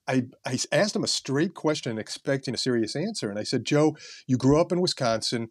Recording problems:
uneven, jittery; strongly; from 0.5 to 5 s

